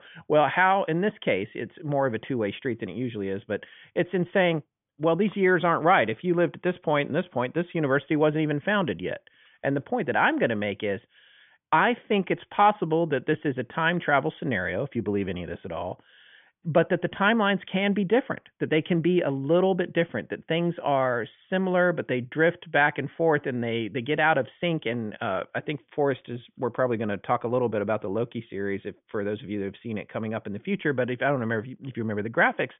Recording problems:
high frequencies cut off; severe; nothing above 3.5 kHz

